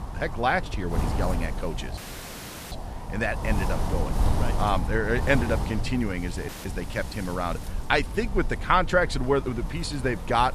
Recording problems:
wind noise on the microphone; occasional gusts; 10 dB below the speech
audio cutting out; filled with static; at 2 s for 1 s and at 6.5 s

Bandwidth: 14.5 kHz